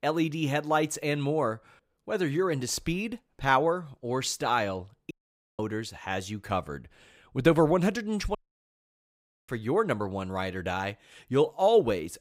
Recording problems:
audio cutting out; at 5 s and at 8.5 s for 1 s

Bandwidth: 15.5 kHz